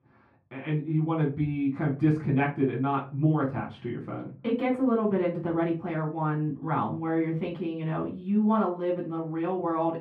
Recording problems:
off-mic speech; far
muffled; very; fading above 3.5 kHz
room echo; very slight; dies away in 0.3 s

